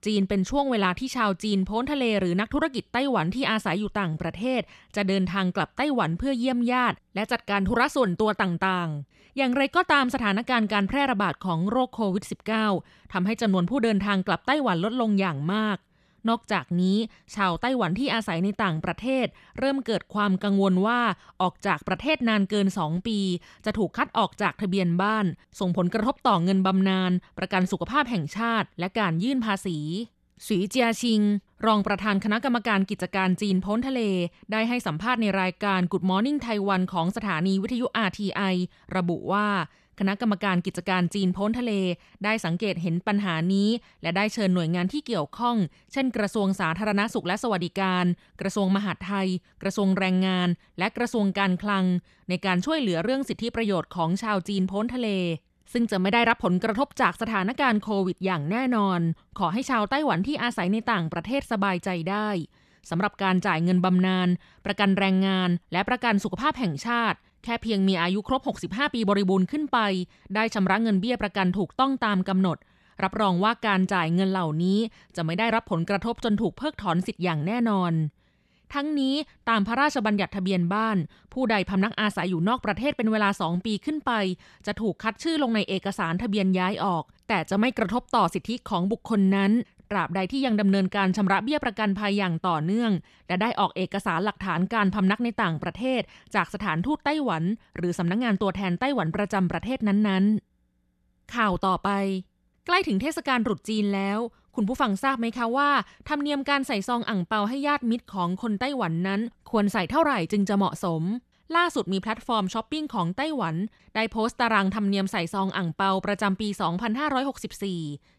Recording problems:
none

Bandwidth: 13.5 kHz